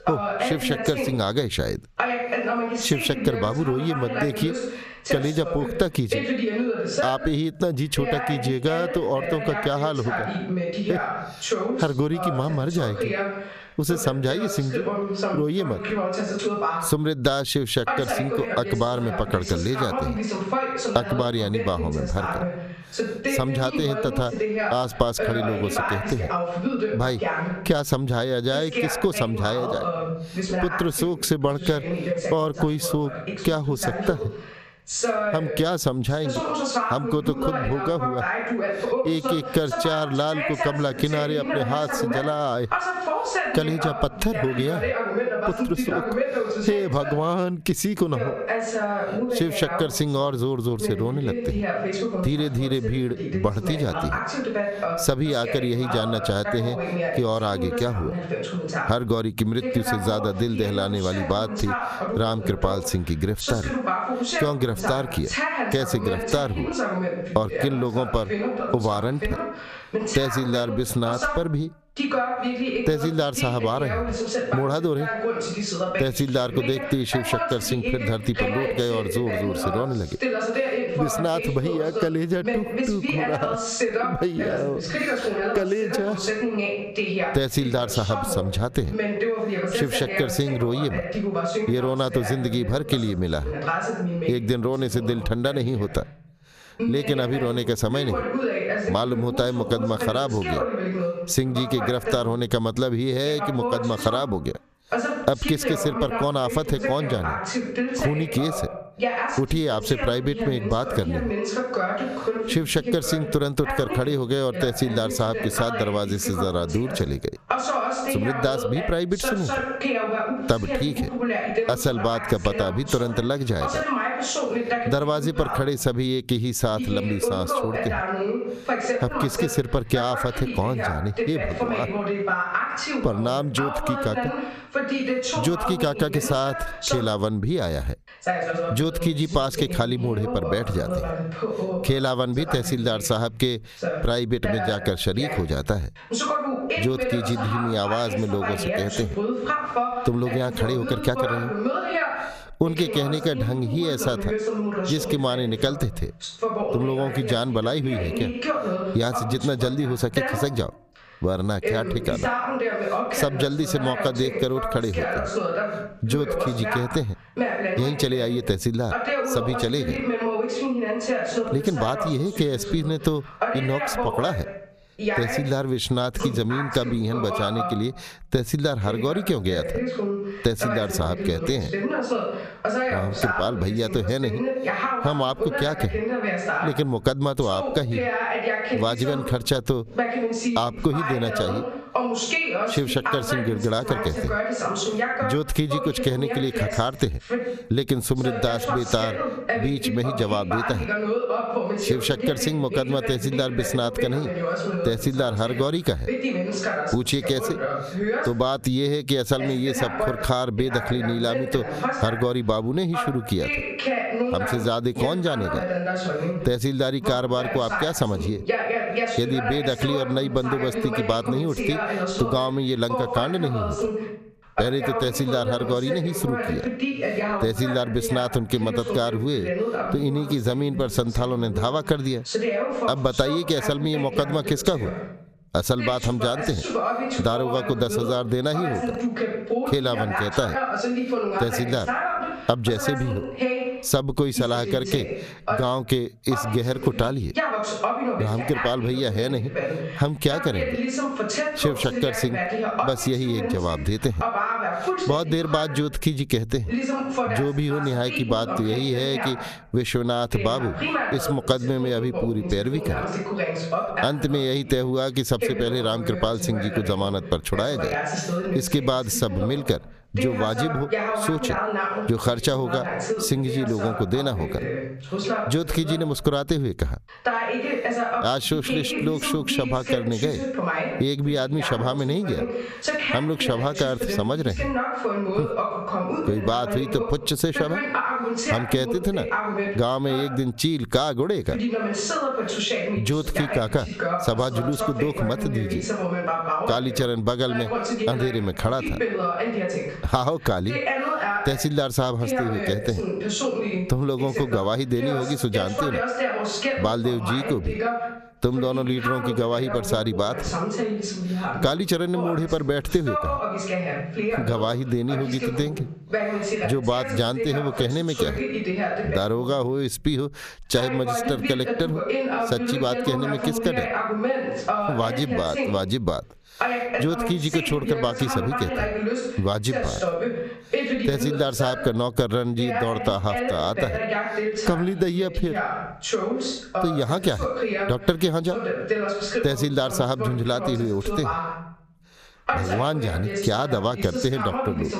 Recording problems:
squashed, flat; somewhat, background pumping
voice in the background; loud; throughout; 3 dB below the speech

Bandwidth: 14.5 kHz